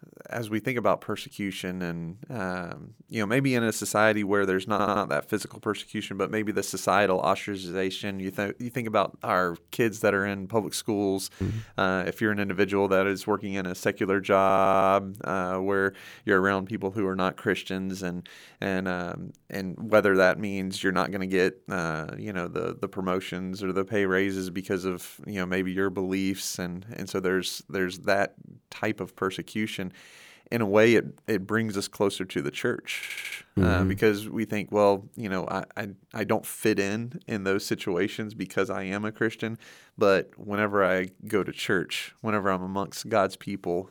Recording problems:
audio stuttering; at 4.5 s, at 14 s and at 33 s

